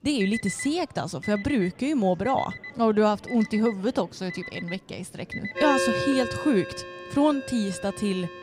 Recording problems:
alarms or sirens; loud; throughout; 8 dB below the speech
chatter from many people; faint; throughout; 25 dB below the speech

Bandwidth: 15.5 kHz